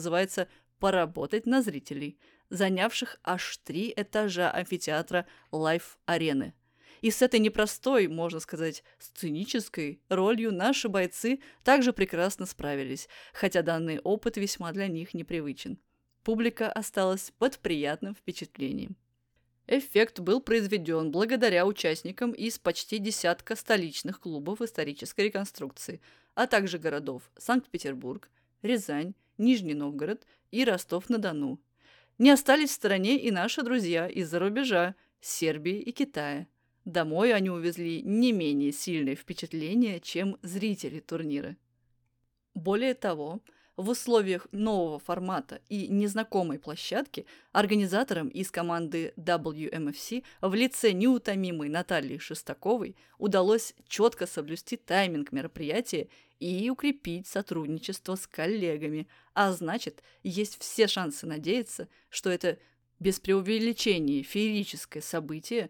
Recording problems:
abrupt cut into speech; at the start

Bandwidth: 18.5 kHz